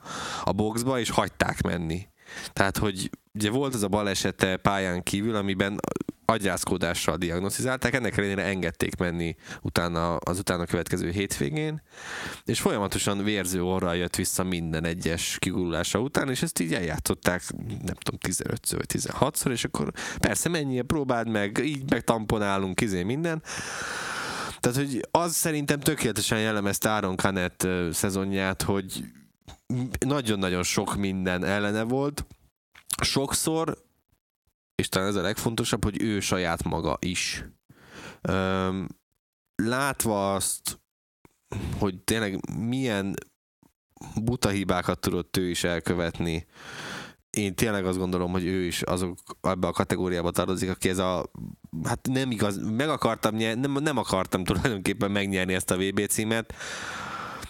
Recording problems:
squashed, flat; heavily

